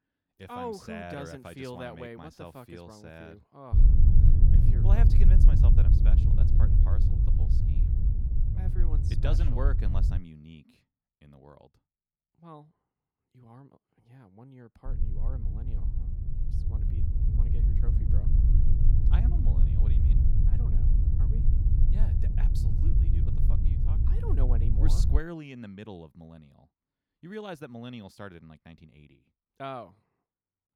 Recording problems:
low rumble; loud; from 3.5 to 10 s and from 15 to 25 s; 1 dB below the speech

